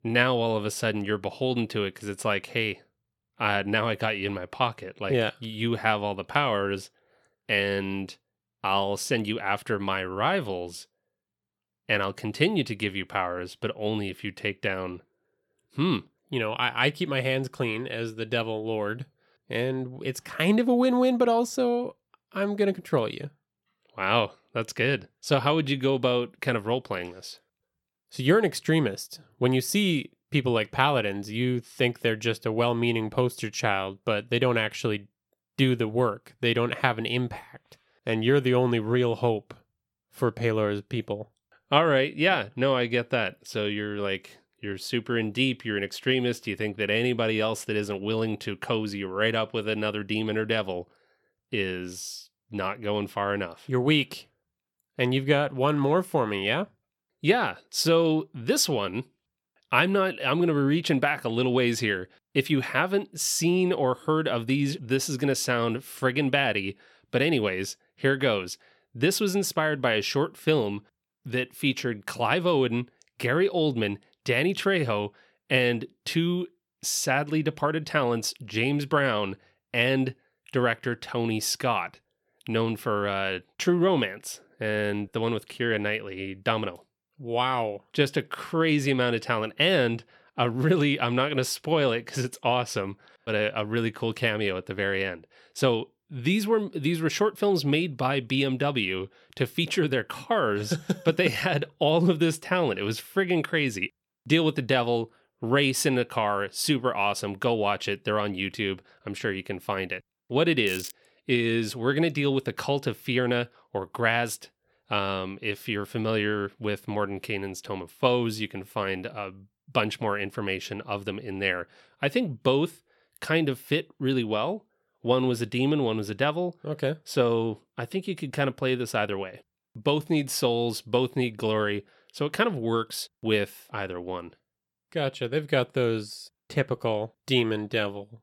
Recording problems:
crackling; noticeable; at 1:51; 15 dB below the speech

